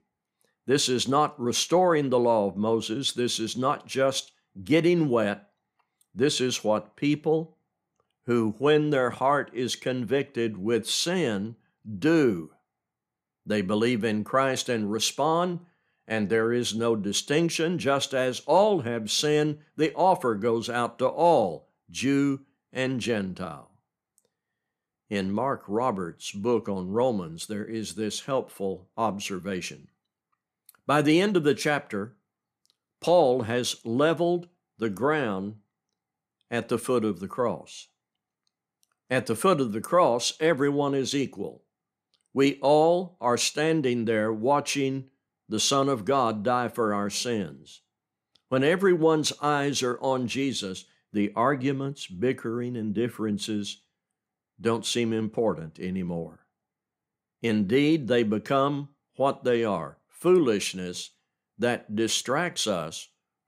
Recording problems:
none

